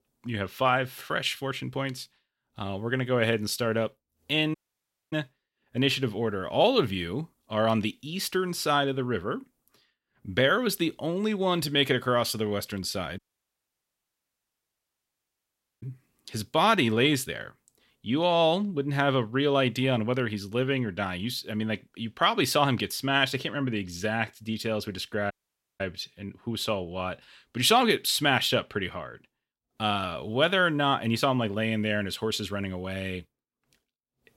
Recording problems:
audio cutting out; at 4.5 s for 0.5 s, at 13 s for 2.5 s and at 25 s

